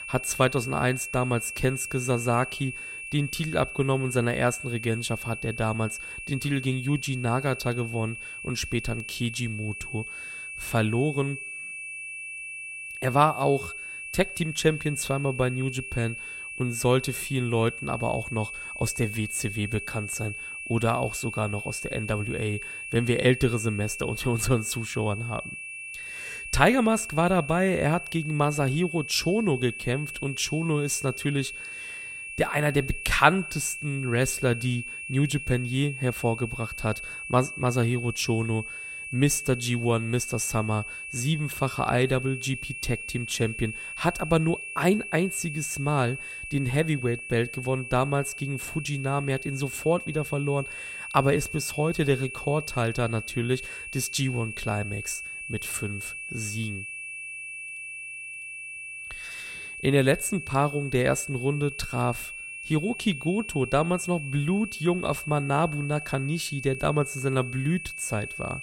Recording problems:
high-pitched whine; loud; throughout; 2.5 kHz, 8 dB below the speech

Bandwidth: 16 kHz